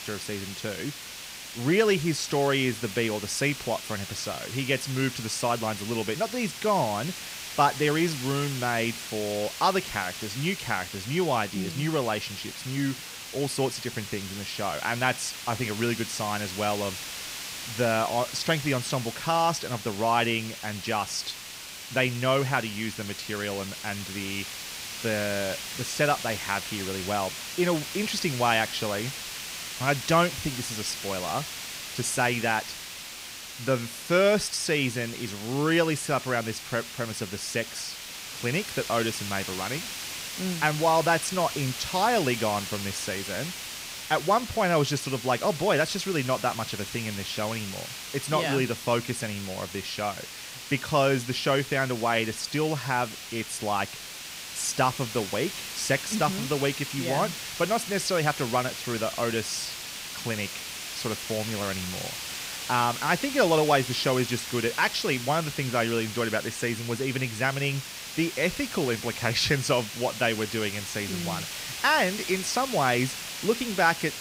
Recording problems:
hiss; loud; throughout; 7 dB below the speech

